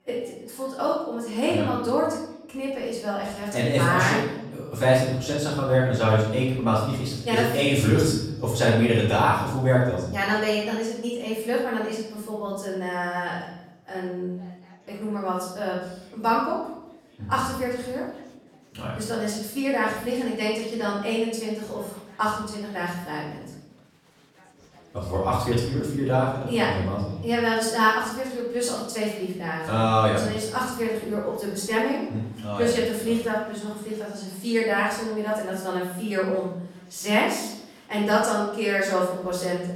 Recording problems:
off-mic speech; far
room echo; noticeable; dies away in 0.8 s
chatter from many people; faint; throughout; 30 dB below the speech

